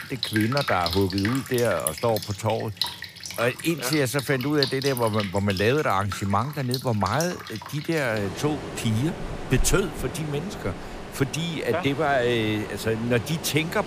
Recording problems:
rain or running water; loud; throughout; 8 dB below the speech

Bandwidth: 15 kHz